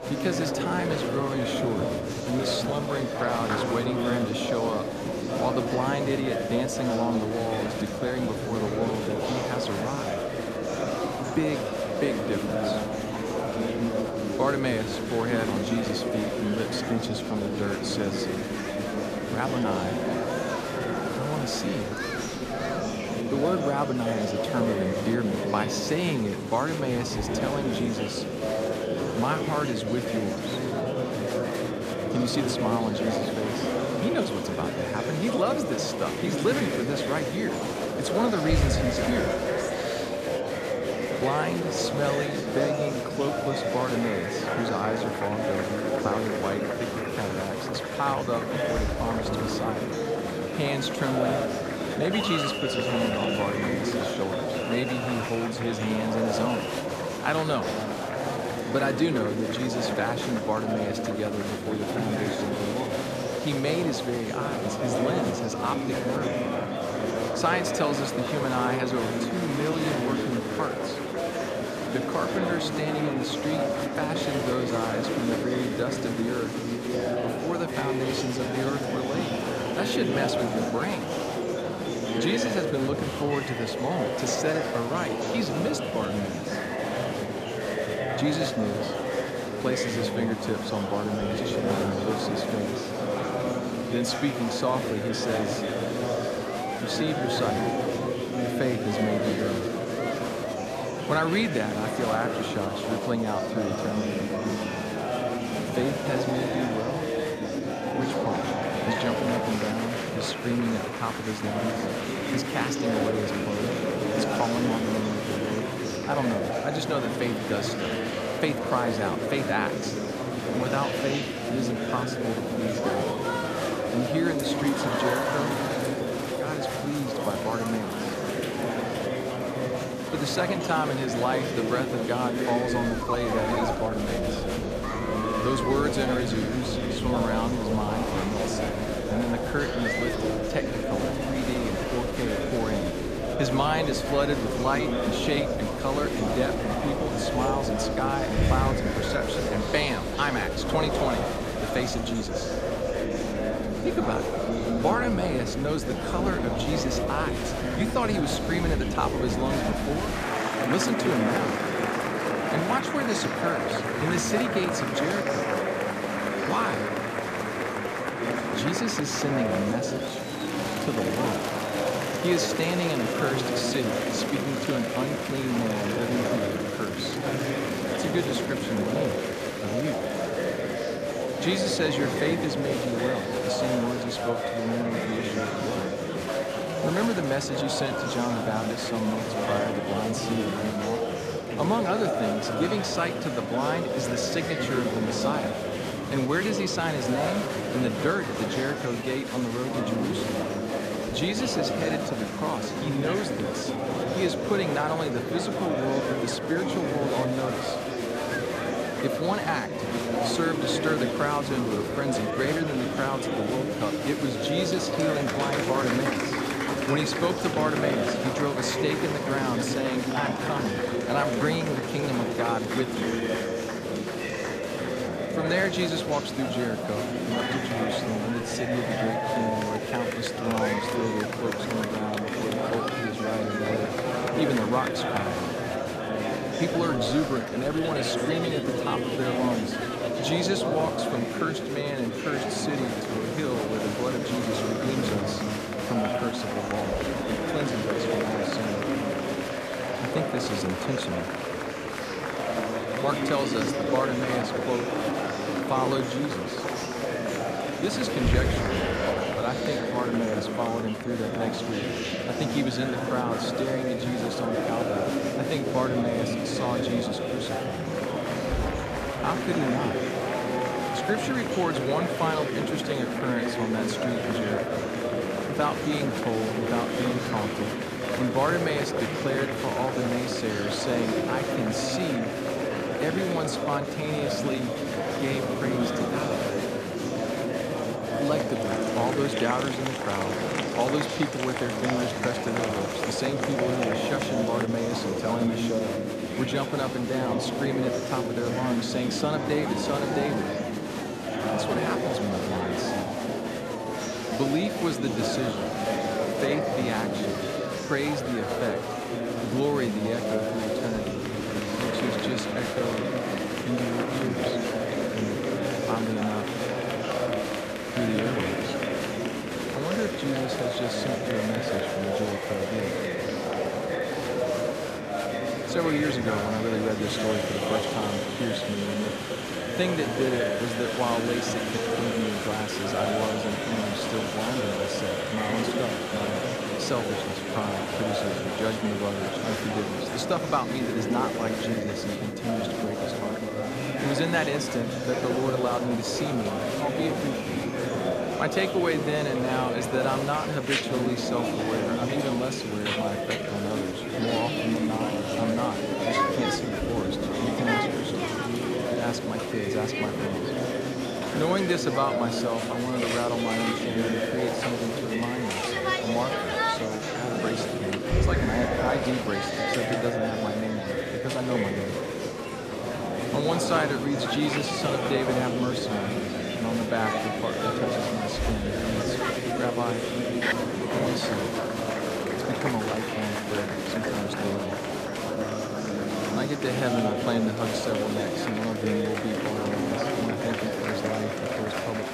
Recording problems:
murmuring crowd; very loud; throughout; 2 dB above the speech

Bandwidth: 14.5 kHz